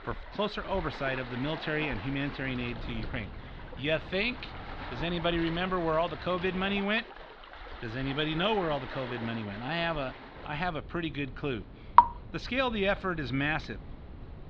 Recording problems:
muffled; slightly; fading above 4 kHz
rain or running water; loud; throughout; 3 dB below the speech
wind noise on the microphone; occasional gusts; from 2.5 to 7 s and from 10 s on; 20 dB below the speech

